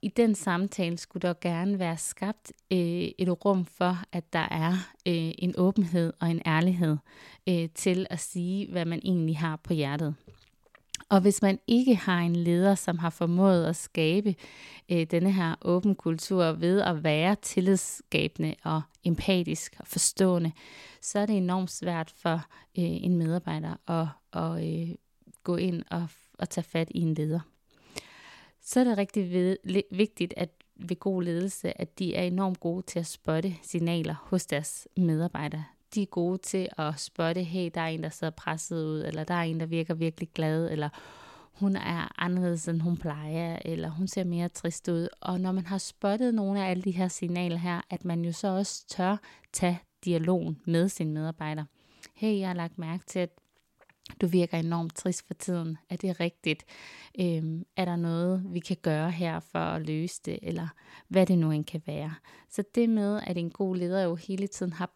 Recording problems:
none

